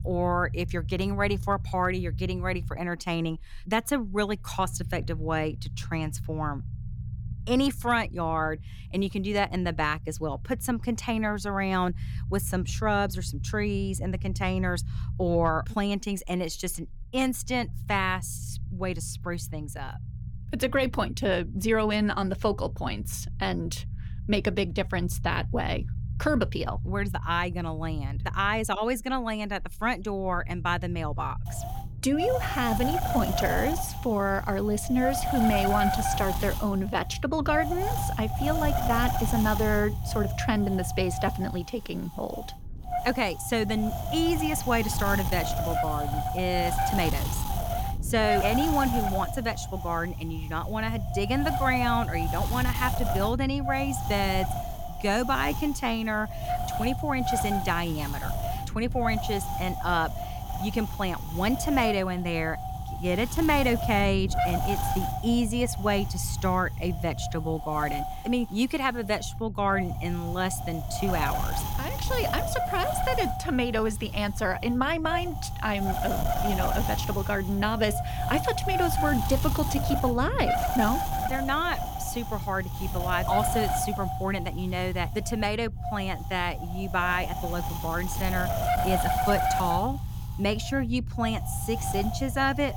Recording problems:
wind noise on the microphone; heavy; from 31 s on; 2 dB below the speech
low rumble; faint; throughout; 20 dB below the speech

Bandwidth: 17.5 kHz